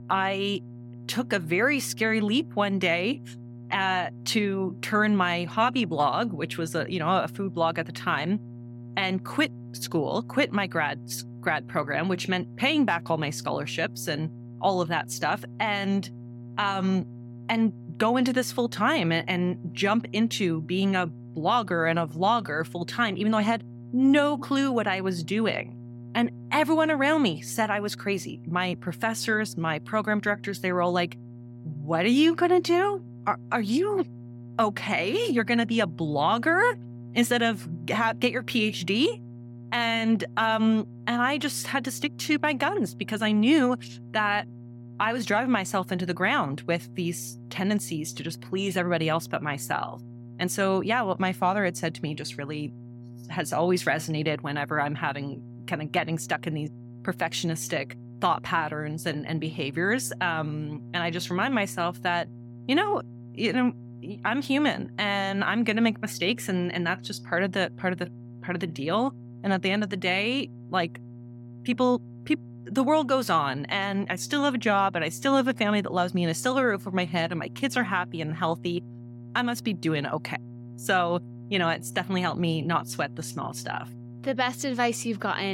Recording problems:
electrical hum; faint; throughout; 60 Hz, 25 dB below the speech
abrupt cut into speech; at the end

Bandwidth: 16.5 kHz